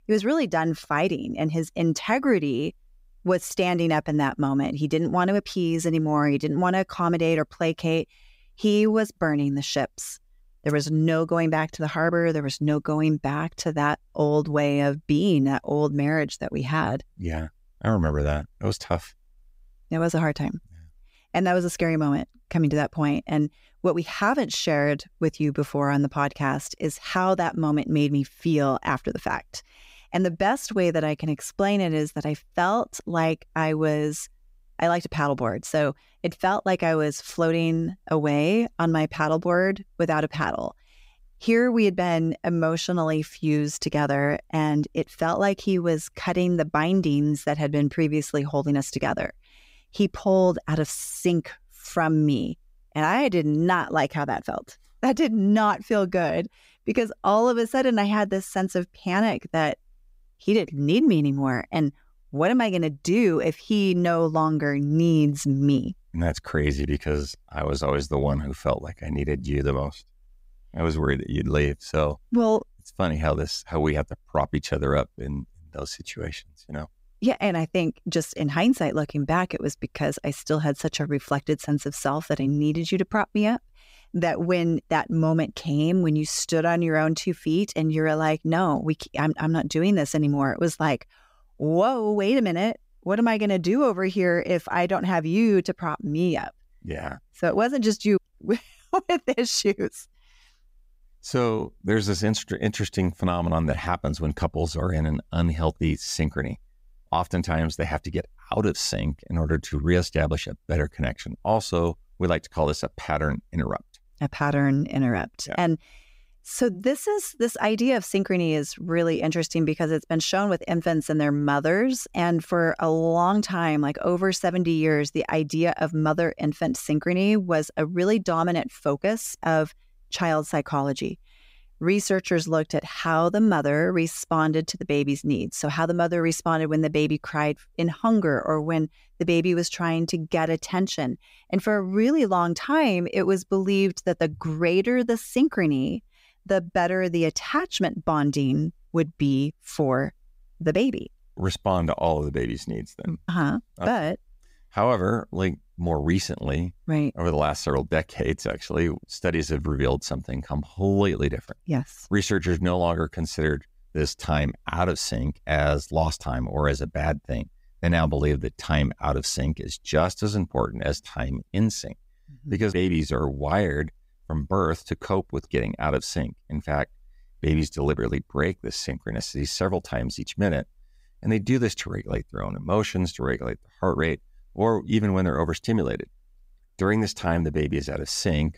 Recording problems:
none

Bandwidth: 15.5 kHz